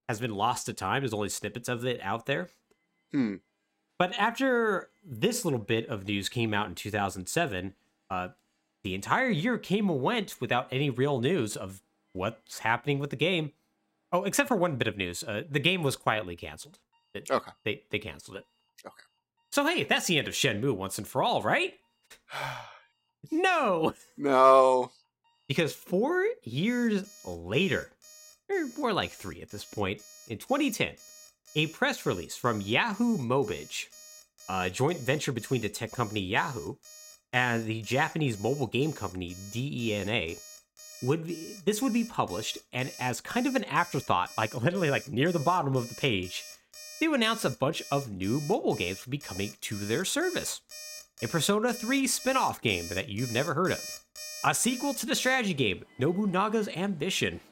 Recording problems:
alarms or sirens; noticeable; throughout; 15 dB below the speech

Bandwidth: 16 kHz